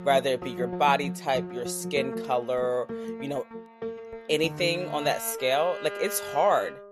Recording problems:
background music; loud; throughout; 10 dB below the speech

